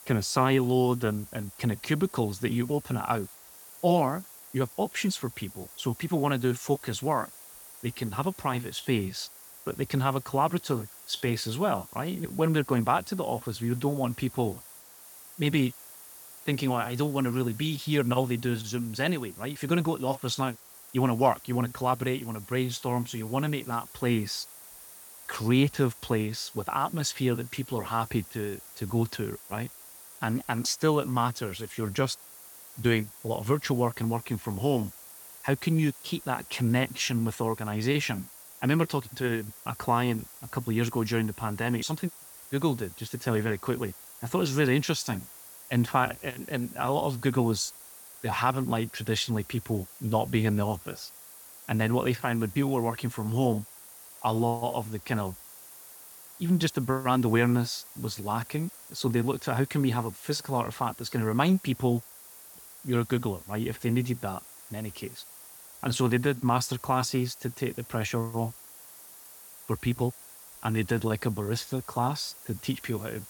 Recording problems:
hiss; noticeable; throughout; 15 dB below the speech

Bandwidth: 18 kHz